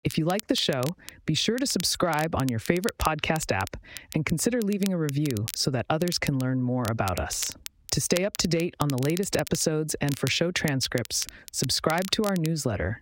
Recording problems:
squashed, flat; heavily
crackle, like an old record; noticeable; 15 dB below the speech

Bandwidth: 16 kHz